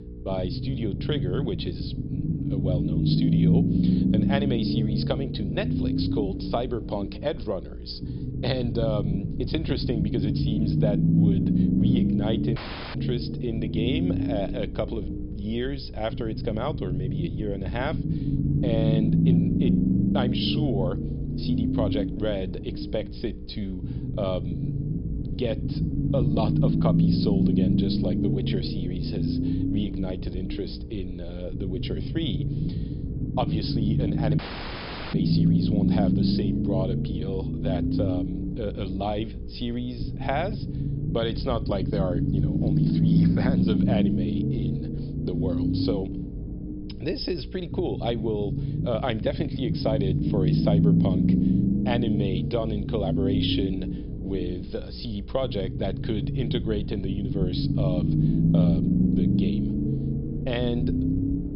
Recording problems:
high frequencies cut off; noticeable; nothing above 5.5 kHz
low rumble; loud; throughout; 1 dB below the speech
electrical hum; noticeable; throughout; 60 Hz, 15 dB below the speech
audio cutting out; at 13 s and at 34 s for 1 s

